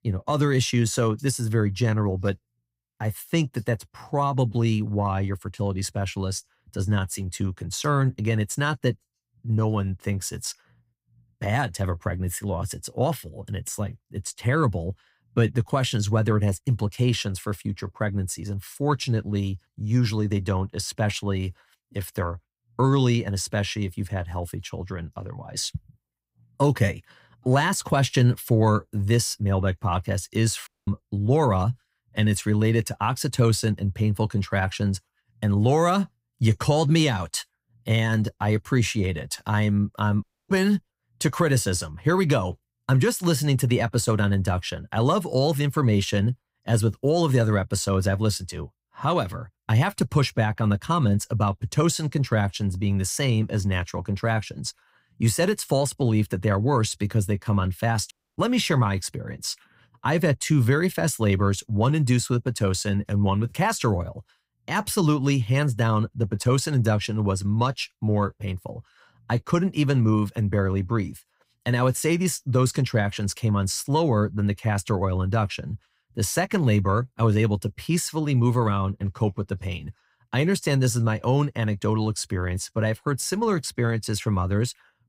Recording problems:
audio cutting out; at 31 s, at 40 s and at 58 s

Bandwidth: 15.5 kHz